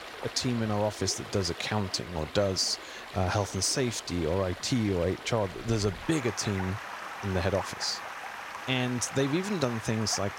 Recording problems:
rain or running water; noticeable; throughout; 10 dB below the speech

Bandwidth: 16 kHz